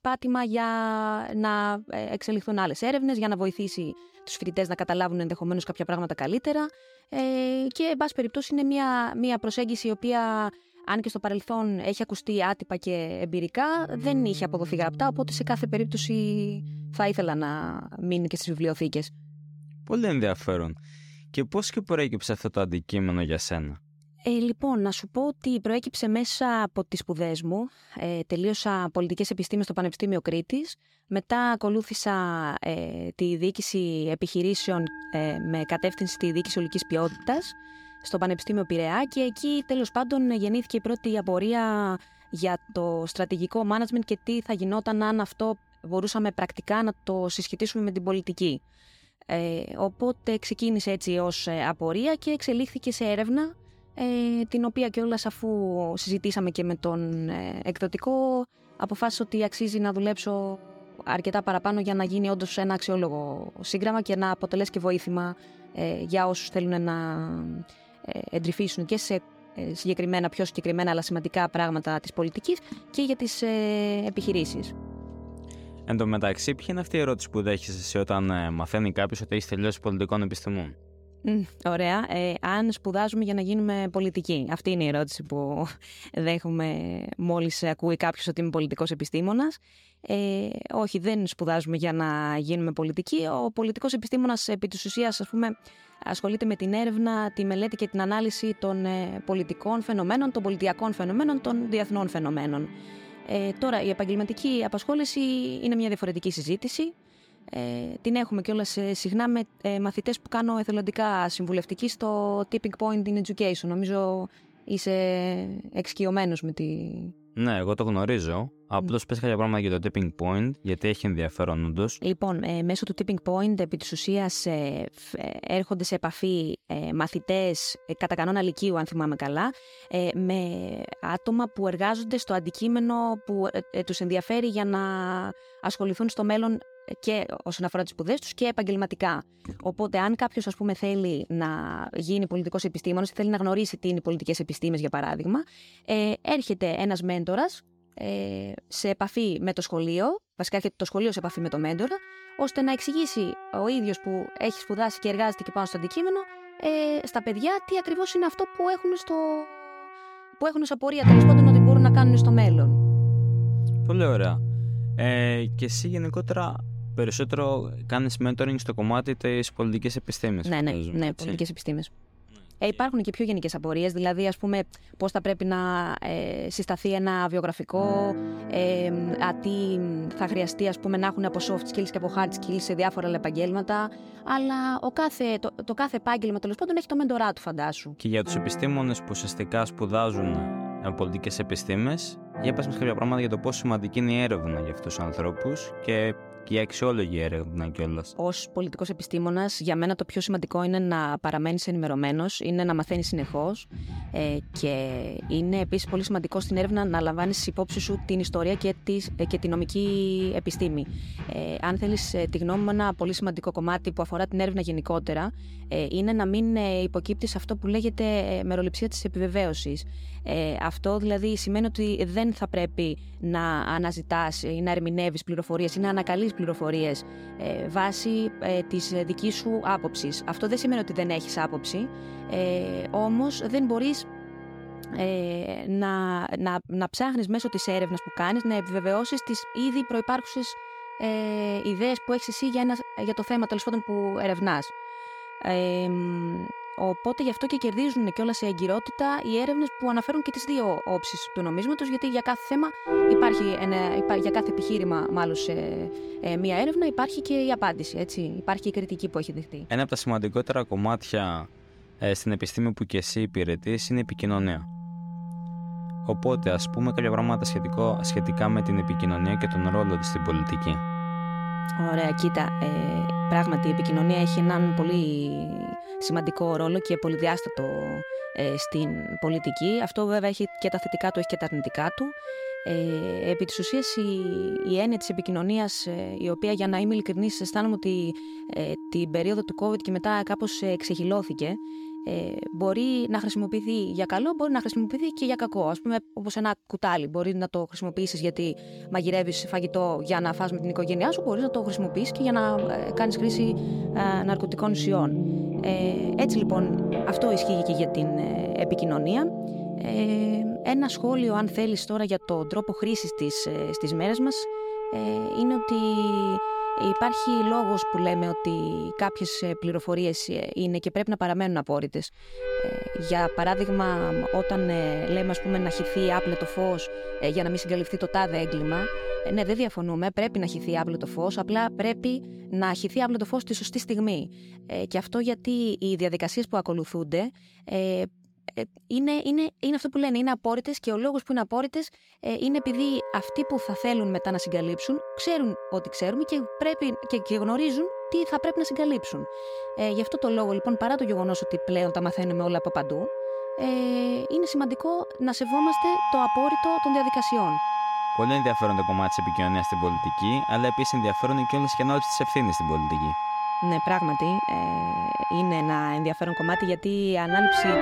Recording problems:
background music; loud; throughout; 3 dB below the speech

